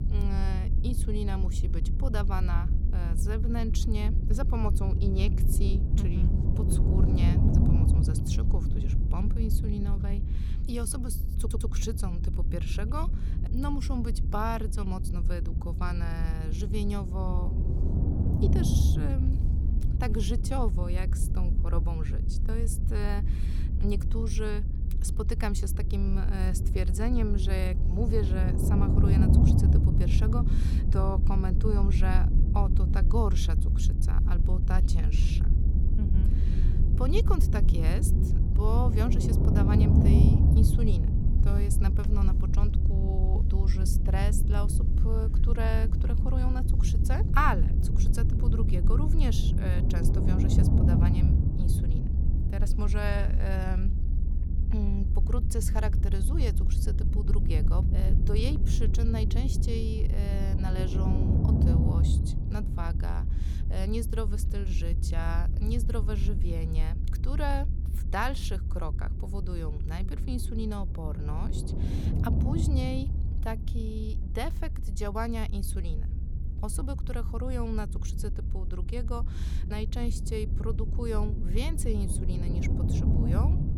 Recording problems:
low rumble; loud; throughout; 3 dB below the speech
audio stuttering; at 11 s

